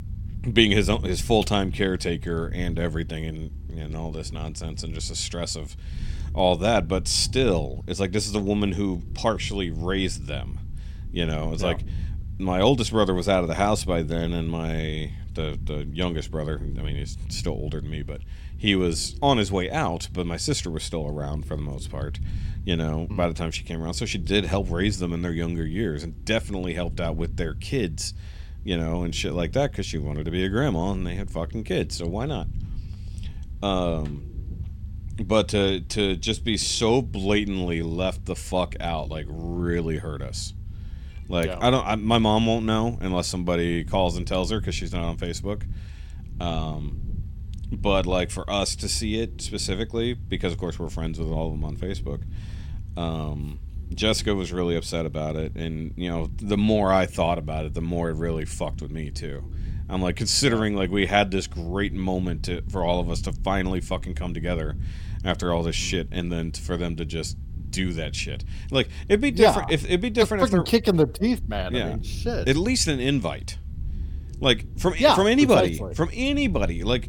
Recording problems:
low rumble; faint; throughout; 25 dB below the speech

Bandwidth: 17.5 kHz